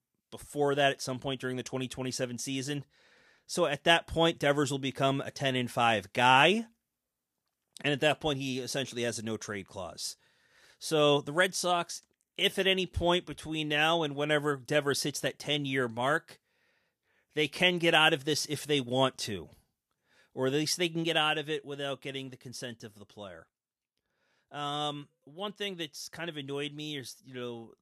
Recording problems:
none

